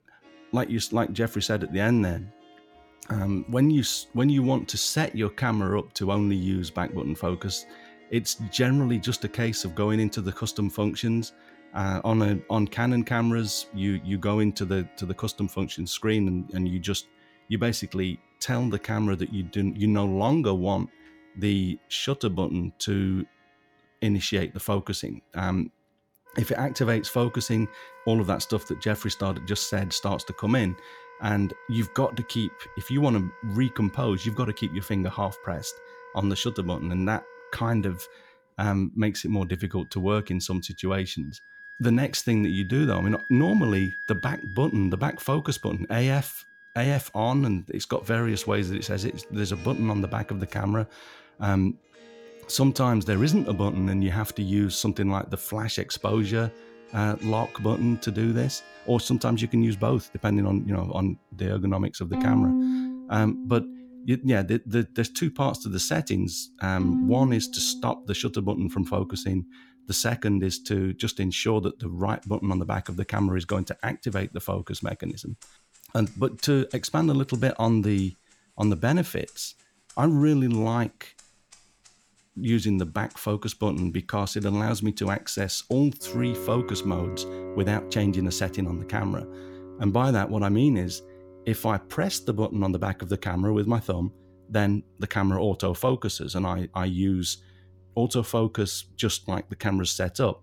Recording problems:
background music; noticeable; throughout; 10 dB below the speech

